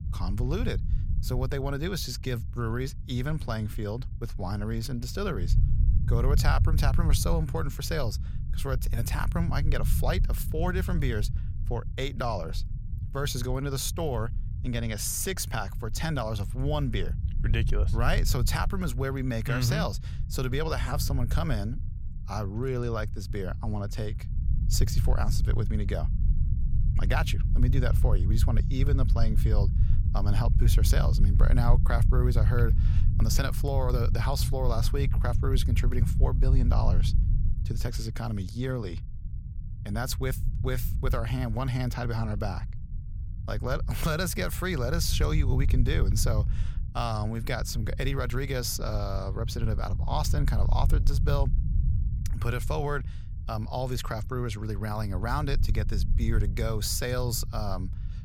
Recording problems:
low rumble; noticeable; throughout; 10 dB below the speech

